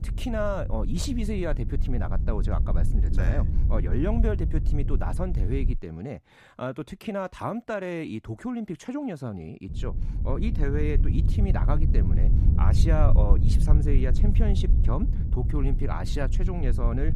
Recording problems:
low rumble; loud; until 6 s and from 9.5 s on; 8 dB below the speech

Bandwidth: 14.5 kHz